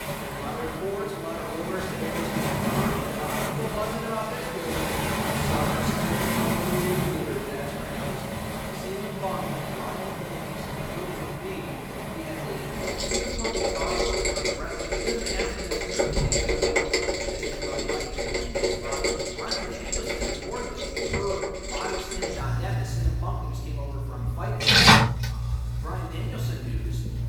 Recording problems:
off-mic speech; far
room echo; noticeable; dies away in 1.4 s
rain or running water; very loud; throughout; 8 dB above the speech

